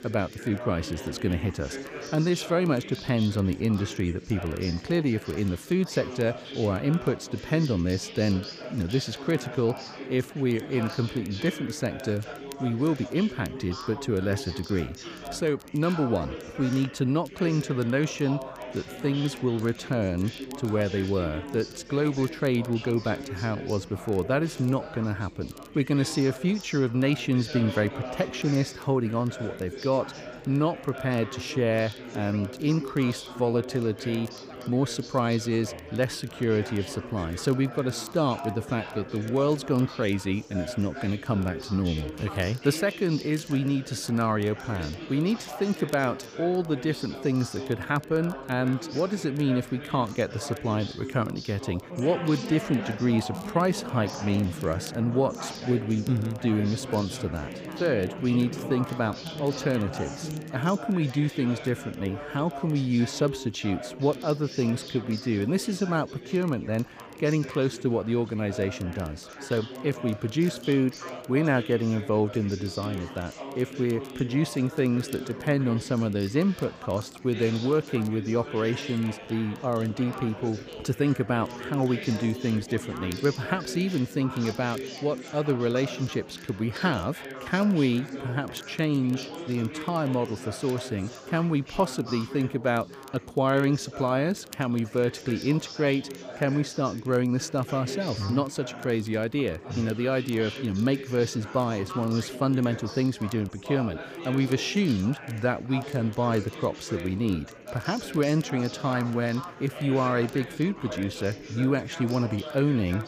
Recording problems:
chatter from many people; noticeable; throughout; 10 dB below the speech
crackle, like an old record; faint; 25 dB below the speech

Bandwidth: 15 kHz